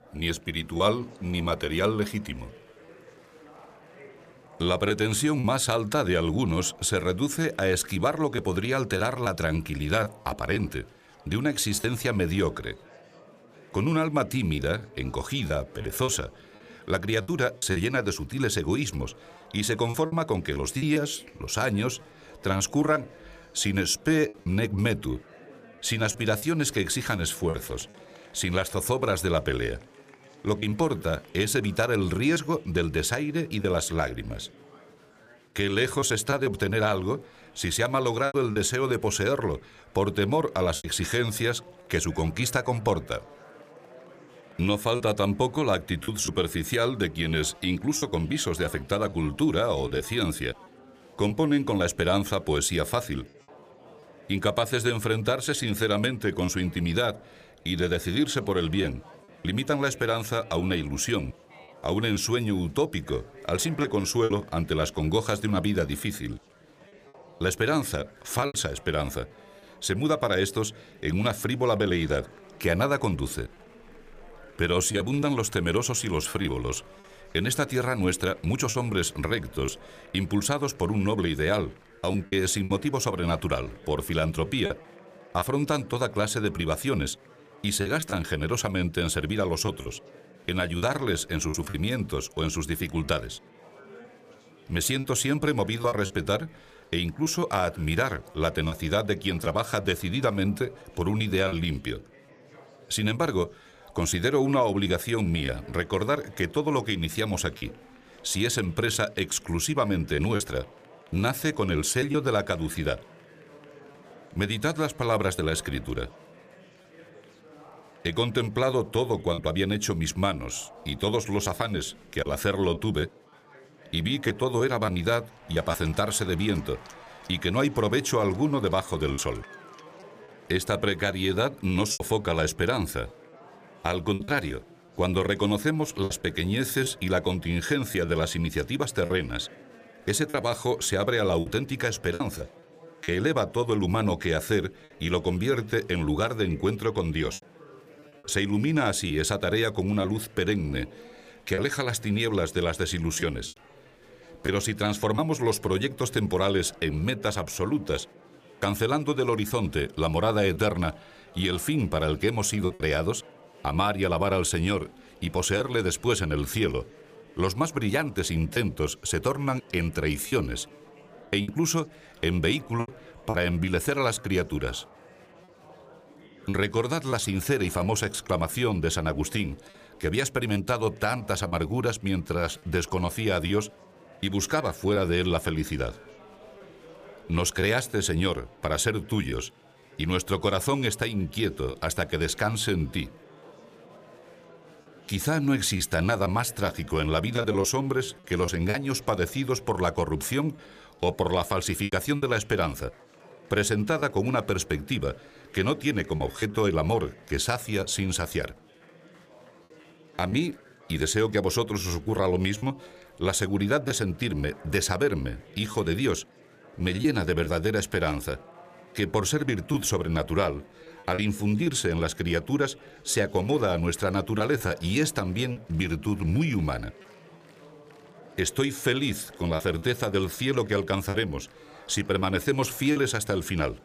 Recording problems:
murmuring crowd; faint; throughout; 25 dB below the speech
choppy; occasionally; 3% of the speech affected

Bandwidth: 15 kHz